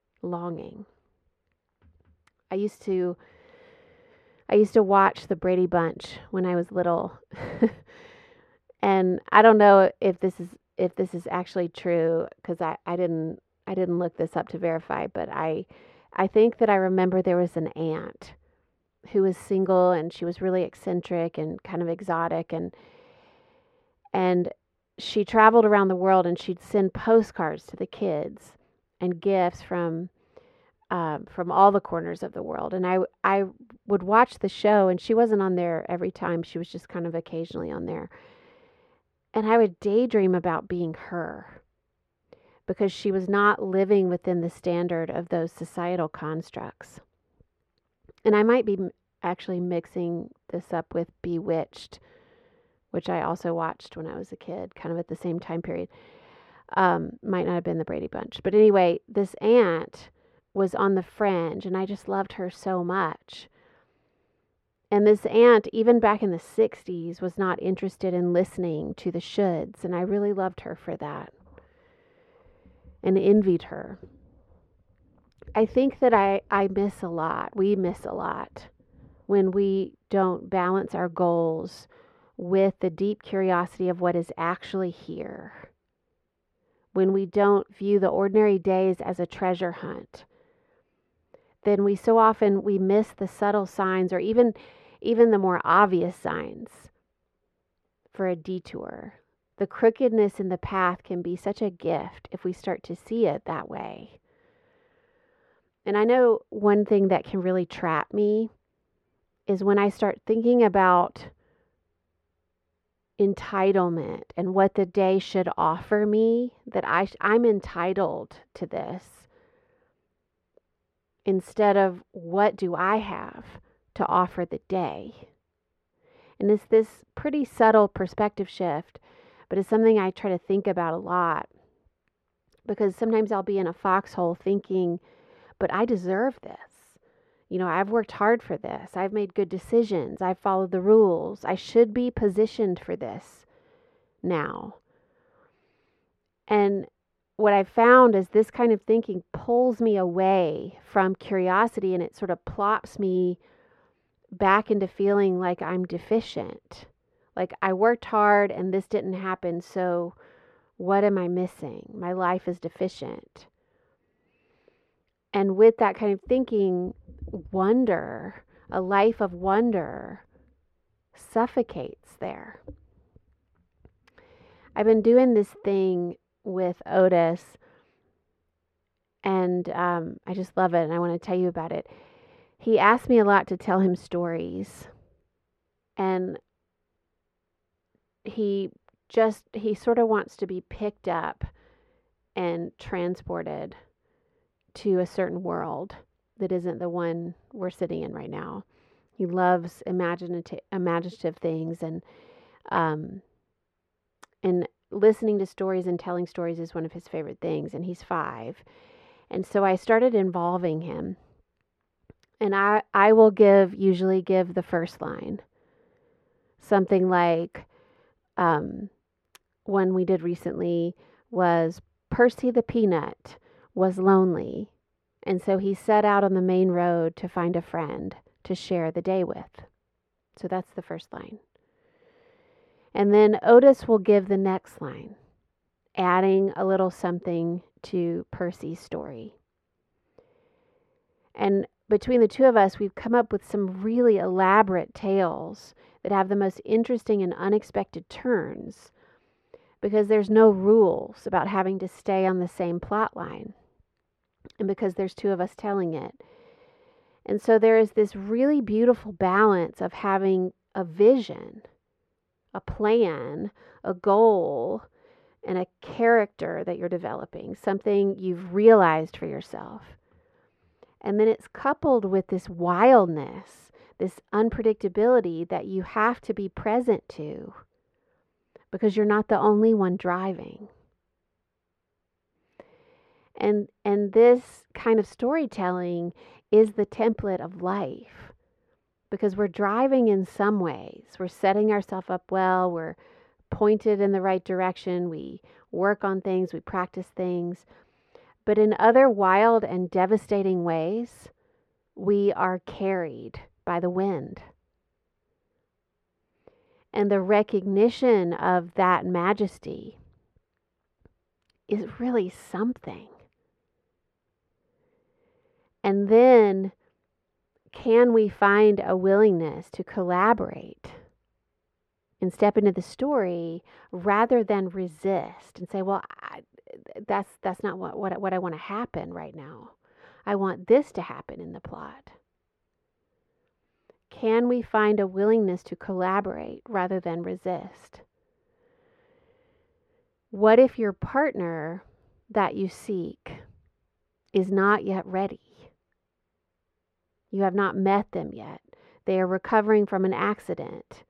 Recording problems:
muffled; very; fading above 4 kHz

